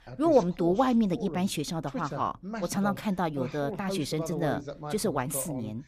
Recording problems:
voice in the background; loud; throughout; 10 dB below the speech

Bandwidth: 15 kHz